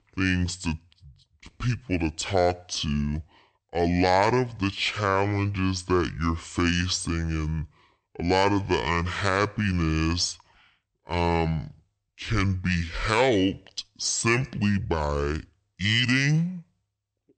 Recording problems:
wrong speed and pitch; too slow and too low; 0.6 times normal speed

